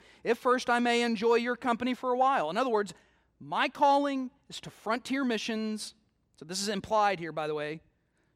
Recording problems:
none

